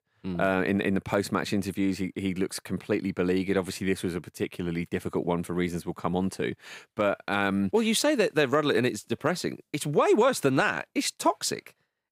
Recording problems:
none

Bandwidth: 15.5 kHz